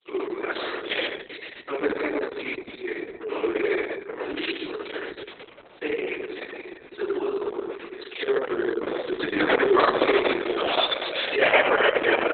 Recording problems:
room echo; strong; dies away in 1.3 s
off-mic speech; far
garbled, watery; badly; nothing above 4 kHz
thin; very; fading below 300 Hz

